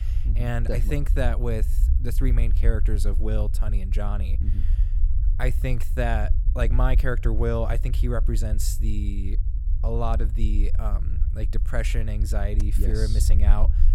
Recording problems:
low rumble; noticeable; throughout; 15 dB below the speech

